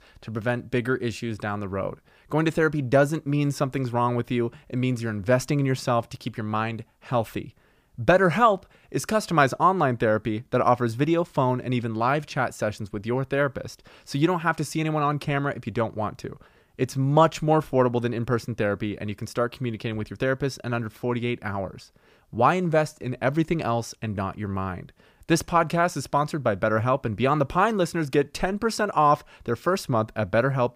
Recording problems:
none

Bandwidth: 15 kHz